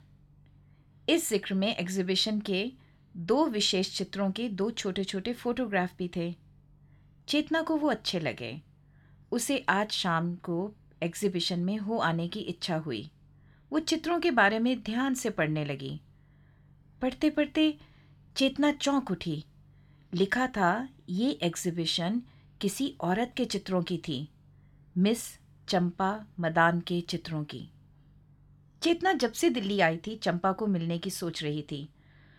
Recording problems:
none

